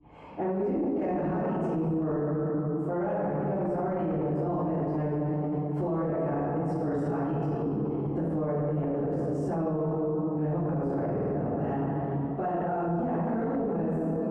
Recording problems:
room echo; strong; dies away in 2.3 s
off-mic speech; far
muffled; very; fading above 1.5 kHz
squashed, flat; somewhat
audio stuttering; at 11 s

